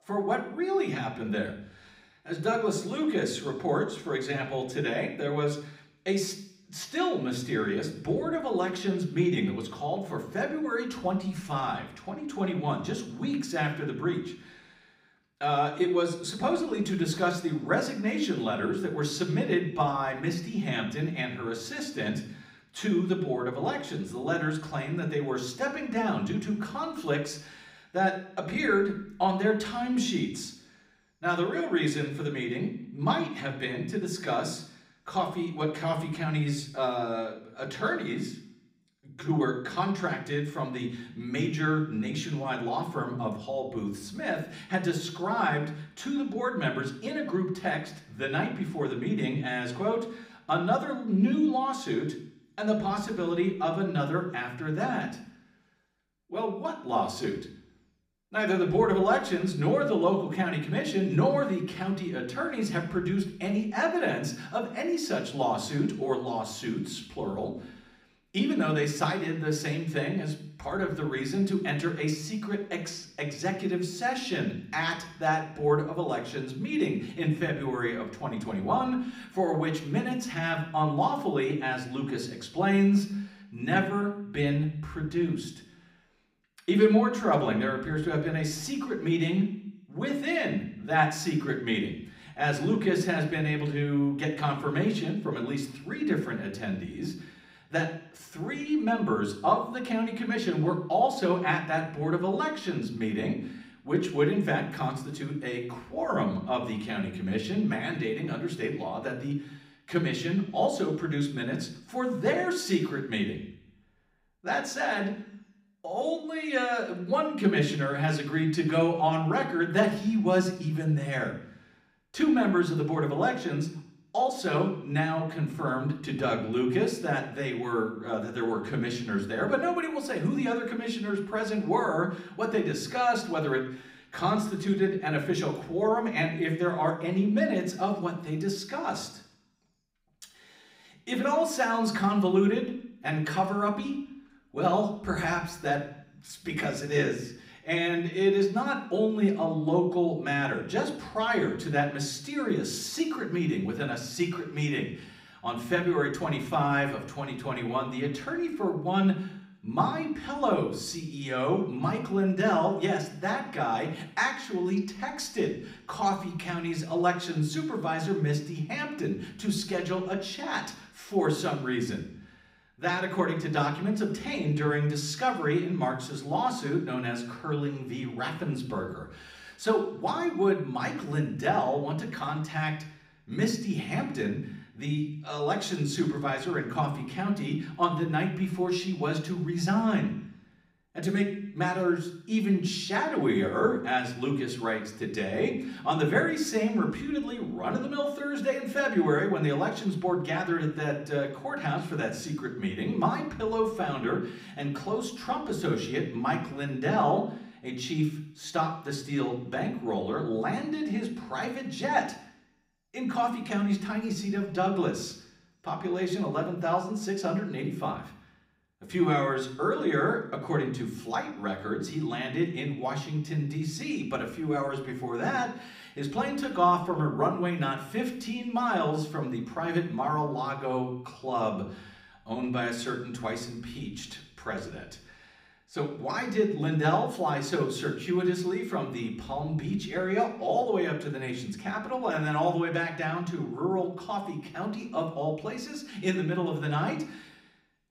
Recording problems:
room echo; slight; dies away in 0.6 s
off-mic speech; somewhat distant

